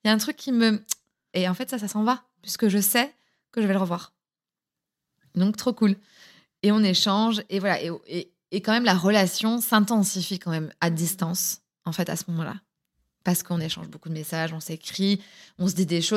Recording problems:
abrupt cut into speech; at the end

